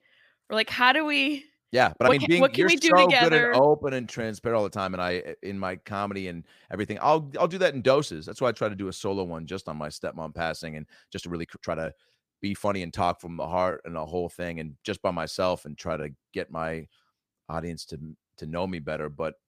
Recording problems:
uneven, jittery; strongly; from 1.5 to 16 s

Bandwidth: 15 kHz